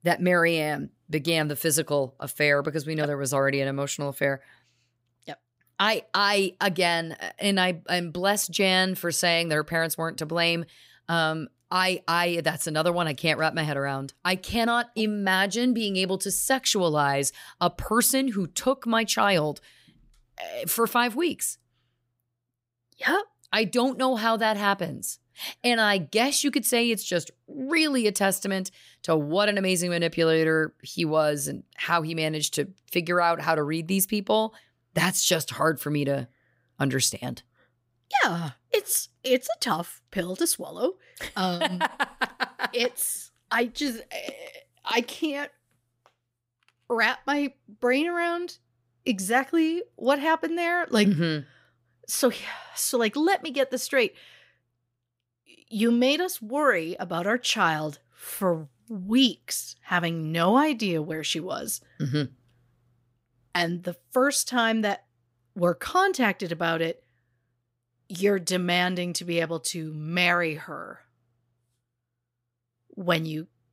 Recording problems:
none

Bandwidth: 15.5 kHz